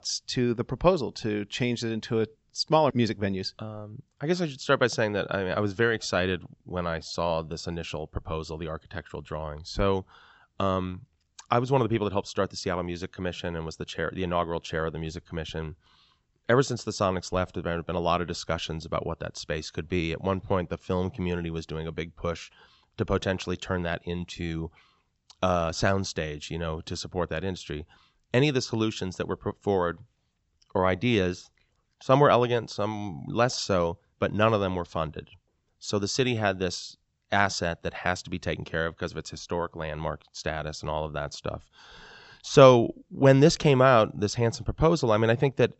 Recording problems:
high frequencies cut off; noticeable; nothing above 8 kHz

